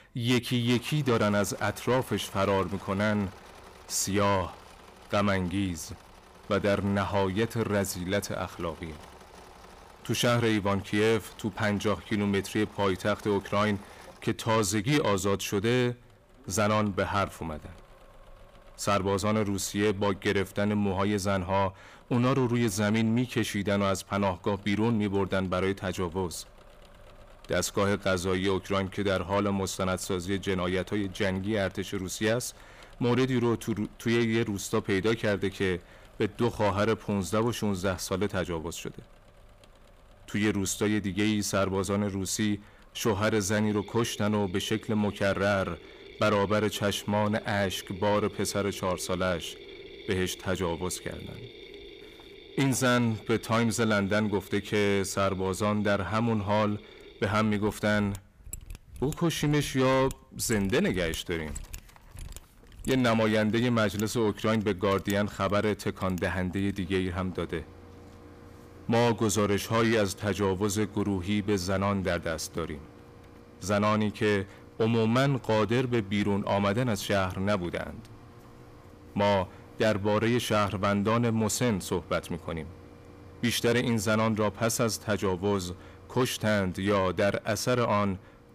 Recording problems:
distortion; slight; 10 dB below the speech
machinery noise; faint; throughout; 20 dB below the speech

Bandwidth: 15 kHz